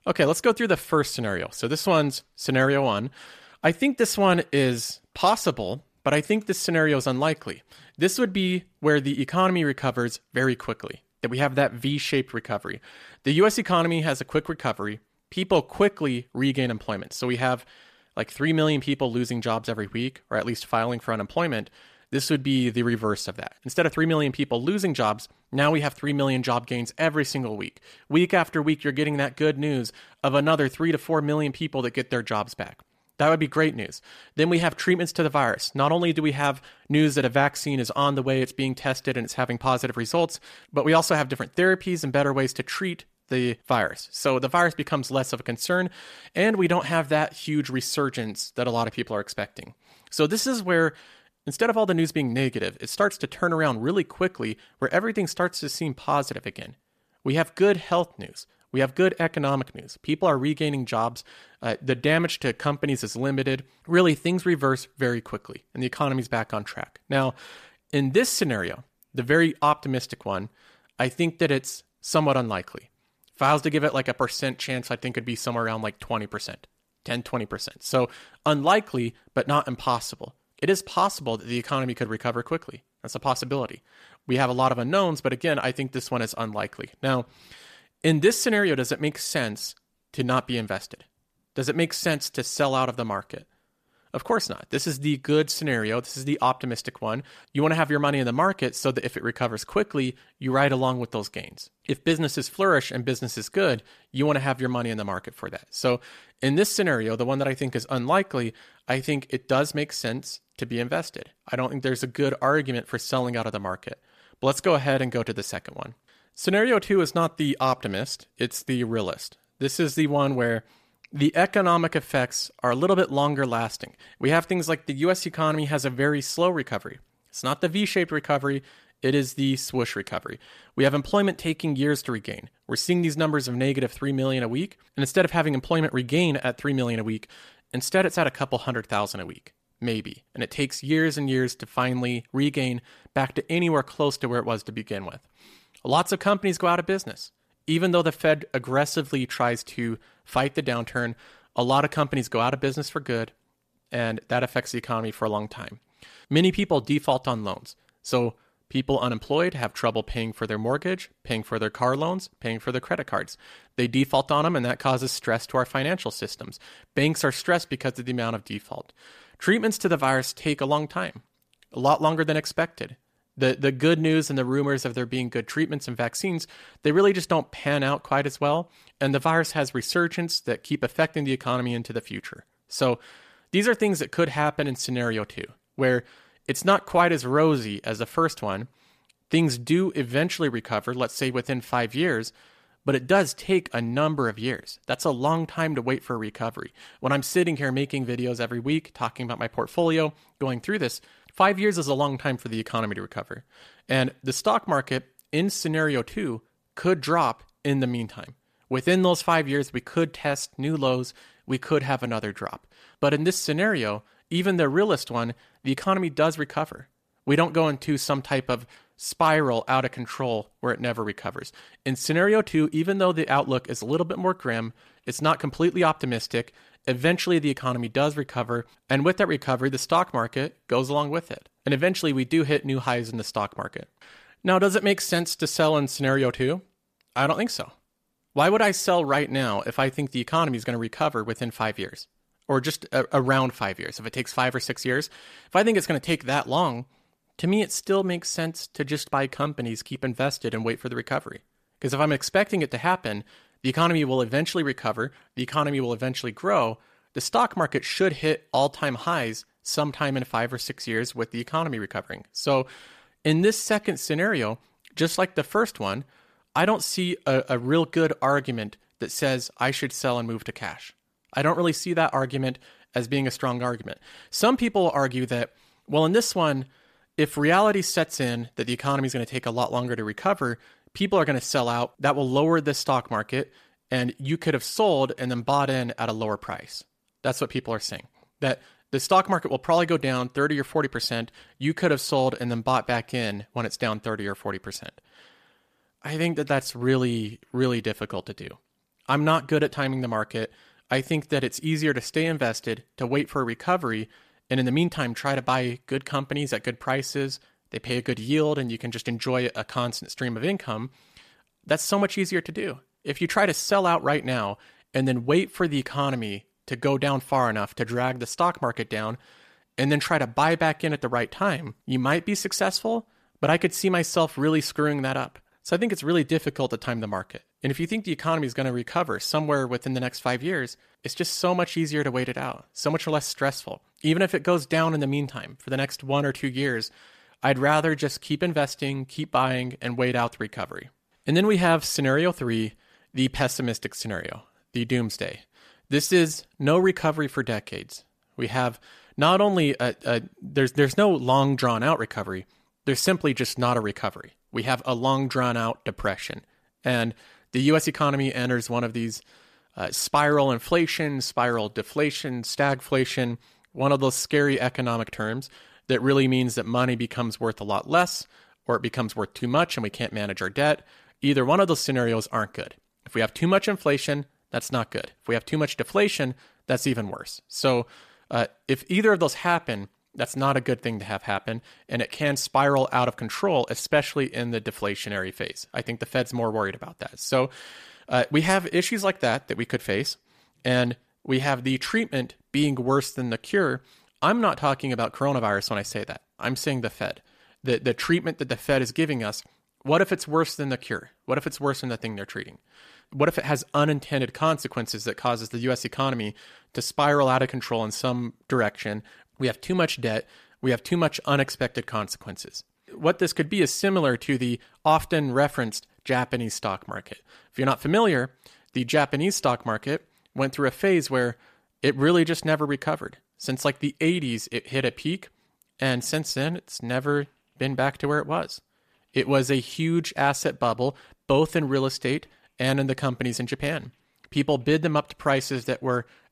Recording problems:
none

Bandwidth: 14.5 kHz